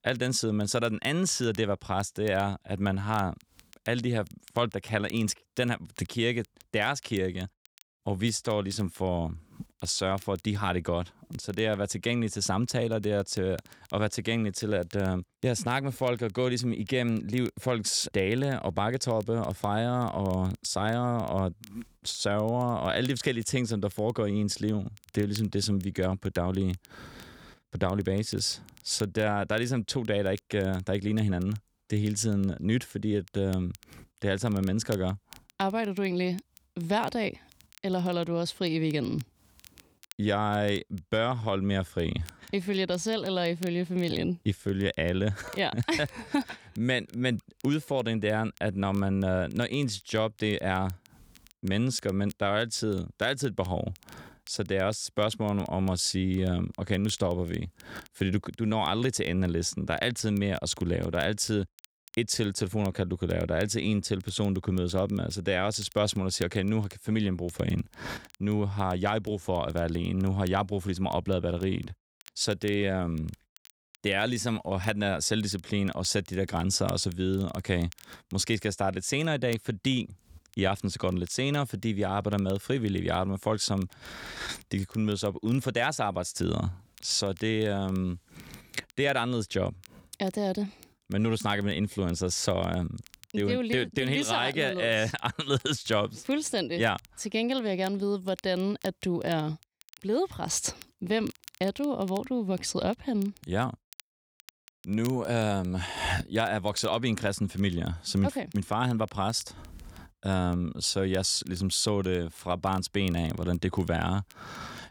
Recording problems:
crackle, like an old record; faint; 25 dB below the speech

